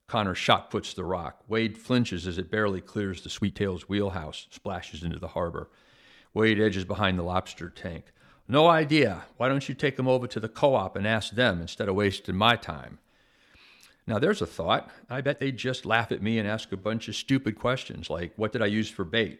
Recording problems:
uneven, jittery; strongly; from 1.5 to 19 s

